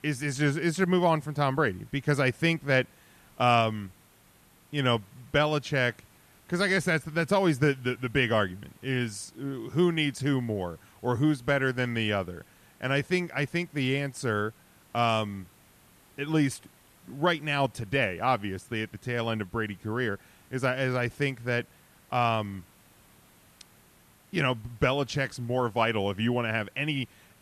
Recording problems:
hiss; faint; throughout; 30 dB below the speech

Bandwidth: 14 kHz